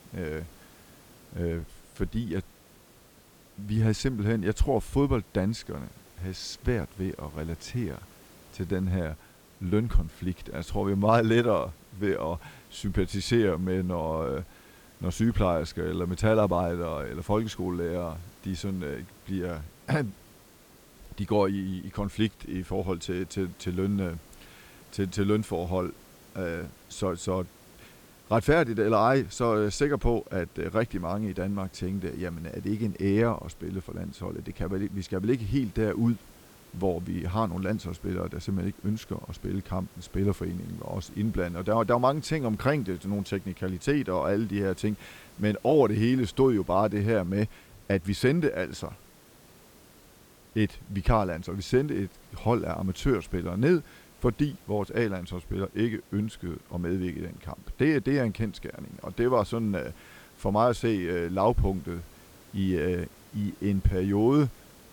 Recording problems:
hiss; faint; throughout; 25 dB below the speech

